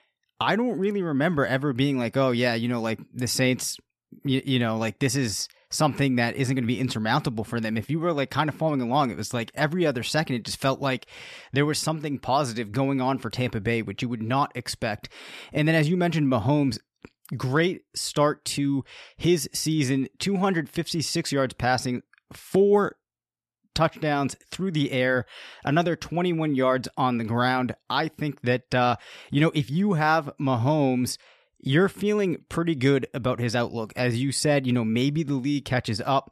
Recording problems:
none

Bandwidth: 13.5 kHz